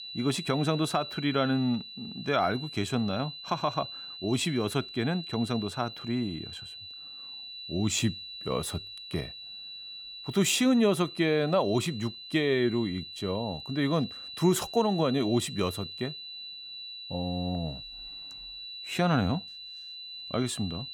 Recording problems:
high-pitched whine; noticeable; throughout; 4 kHz, 10 dB below the speech

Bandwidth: 17.5 kHz